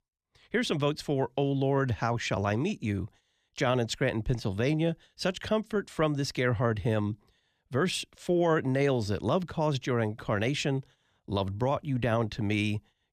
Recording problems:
none

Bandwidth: 14.5 kHz